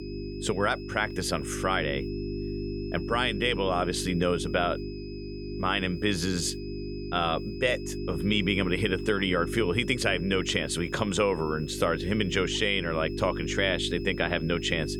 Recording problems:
electrical hum; noticeable; throughout; 50 Hz, 10 dB below the speech
high-pitched whine; faint; throughout; 5 kHz, 20 dB below the speech

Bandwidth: 18 kHz